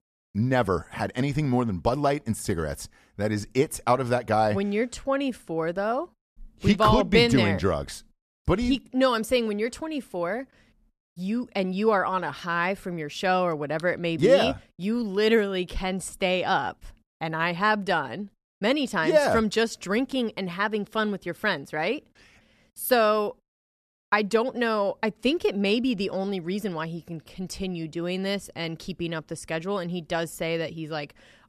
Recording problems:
none

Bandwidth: 13.5 kHz